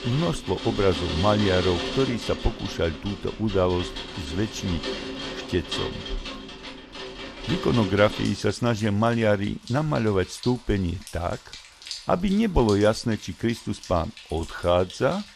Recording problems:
rain or running water; loud; throughout; 9 dB below the speech

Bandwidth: 14.5 kHz